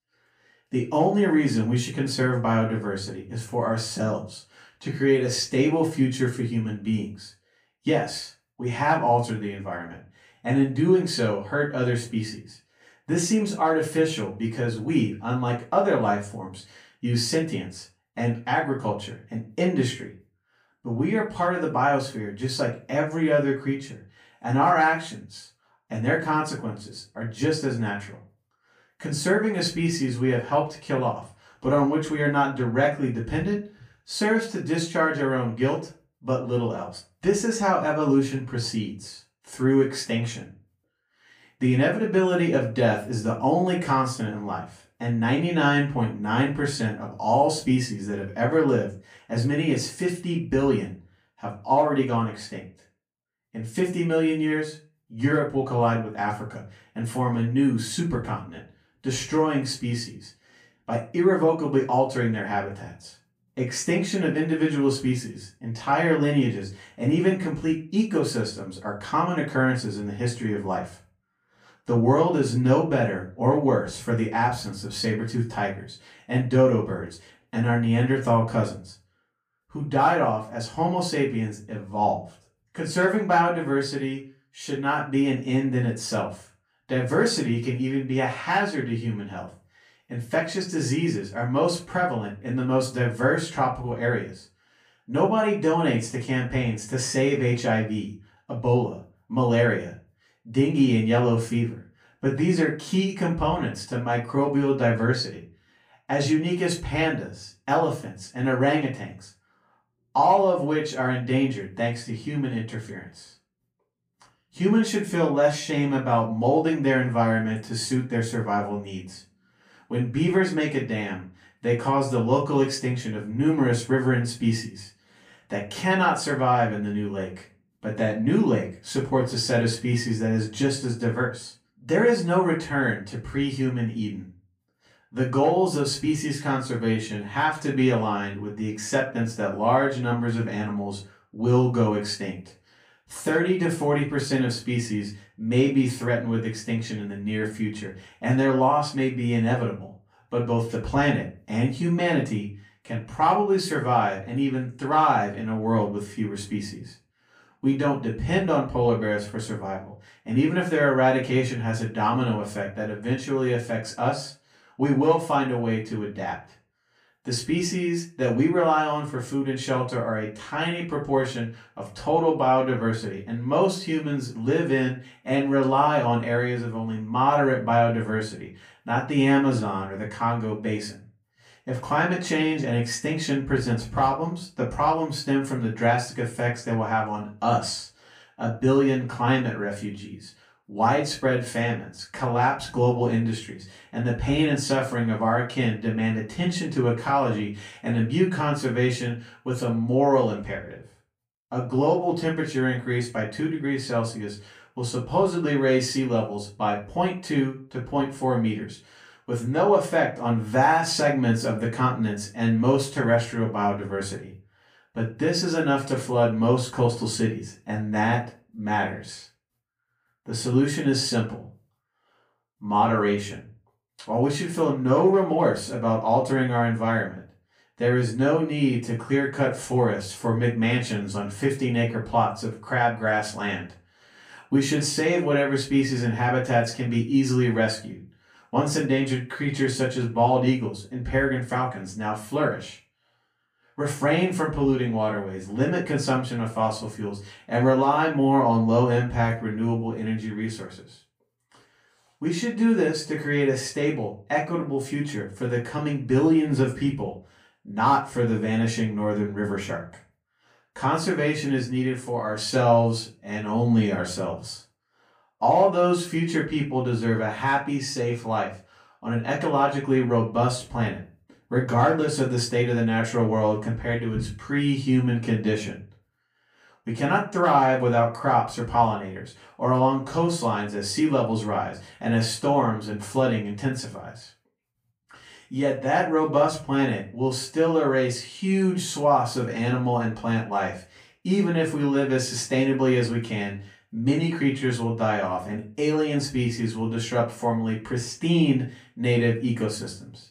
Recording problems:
off-mic speech; far
room echo; slight; dies away in 0.3 s

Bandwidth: 15 kHz